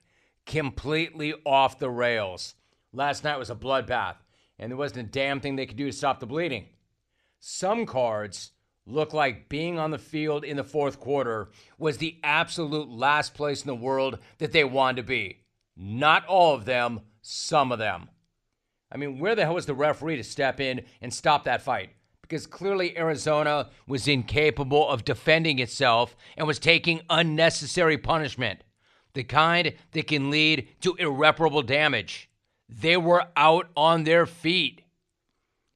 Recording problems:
none

